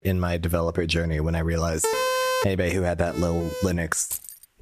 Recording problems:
squashed, flat; somewhat
siren; loud; at 2 s; peak 2 dB above the speech
siren; noticeable; at 3 s; peak 10 dB below the speech
jangling keys; noticeable; at 4 s; peak 7 dB below the speech

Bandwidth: 14.5 kHz